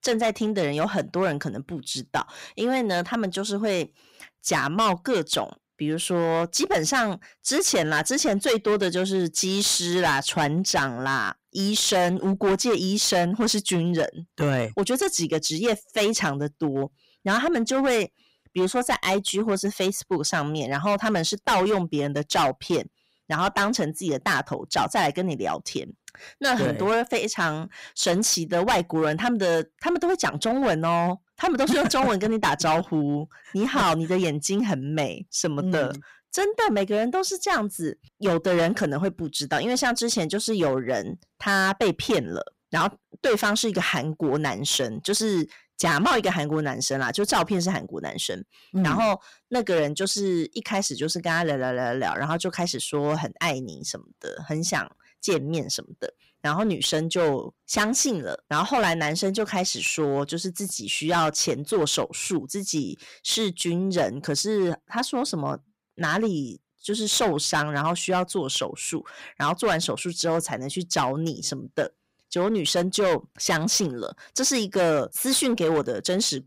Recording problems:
distortion; heavy; 9% of the sound clipped

